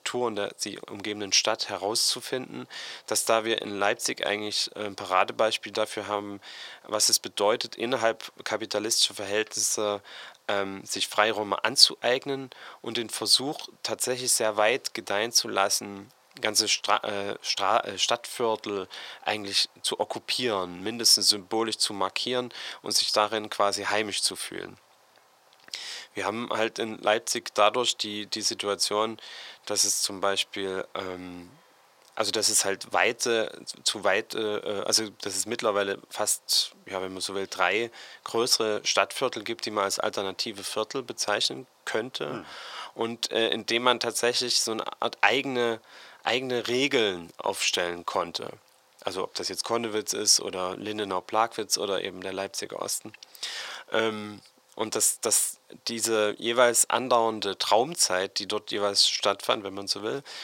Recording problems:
thin; very; fading below 650 Hz

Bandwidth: 16 kHz